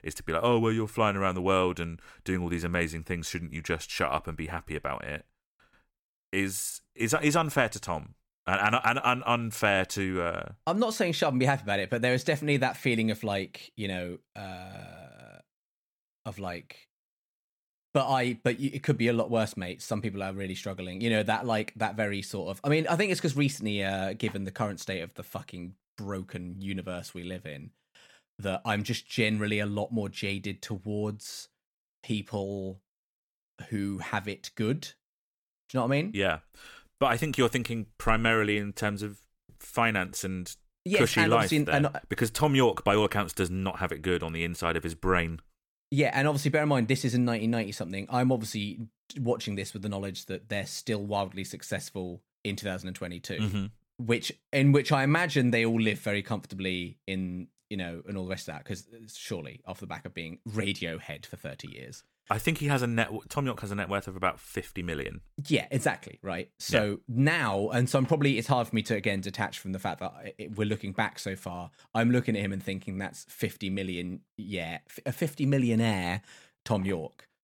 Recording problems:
none

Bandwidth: 18 kHz